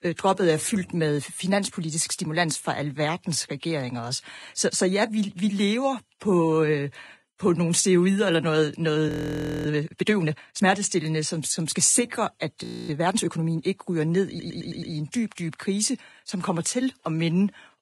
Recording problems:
garbled, watery; badly; nothing above 10.5 kHz
audio freezing; at 9 s for 0.5 s and at 13 s
audio stuttering; at 14 s

